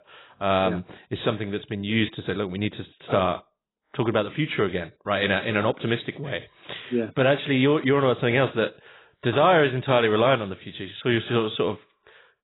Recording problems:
garbled, watery; badly; nothing above 4 kHz

